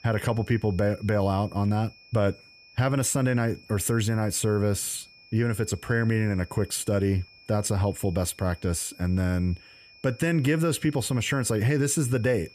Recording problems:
high-pitched whine; faint; throughout; 2.5 kHz, 25 dB below the speech

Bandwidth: 14.5 kHz